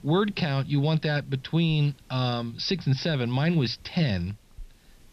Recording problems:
high frequencies cut off; noticeable; nothing above 5.5 kHz
hiss; faint; throughout; 30 dB below the speech

